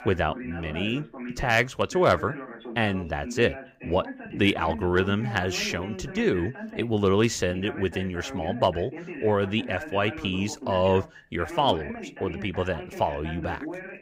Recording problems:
voice in the background; noticeable; throughout; 10 dB below the speech

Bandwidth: 15.5 kHz